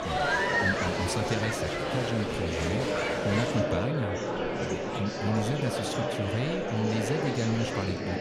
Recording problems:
murmuring crowd; very loud; throughout; 3 dB above the speech
electrical hum; faint; throughout; 60 Hz, 25 dB below the speech

